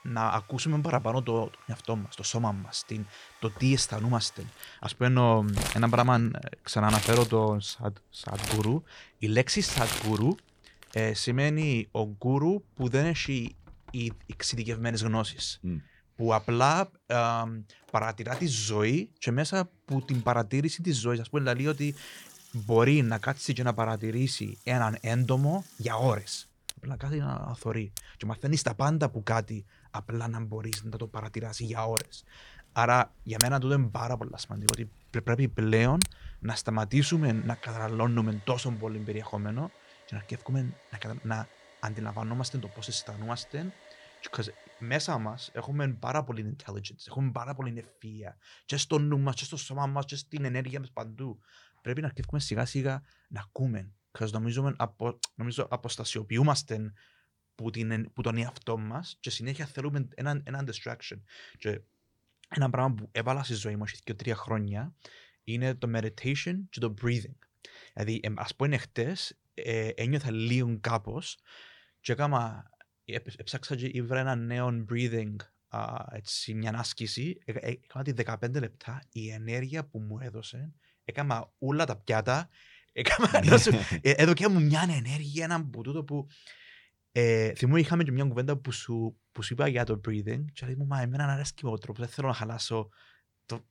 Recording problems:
household noises; loud; until 46 s; 5 dB below the speech

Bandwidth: 19 kHz